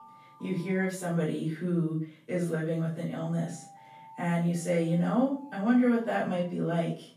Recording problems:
off-mic speech; far
room echo; noticeable; dies away in 0.3 s
alarms or sirens; faint; throughout; 25 dB below the speech

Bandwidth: 14.5 kHz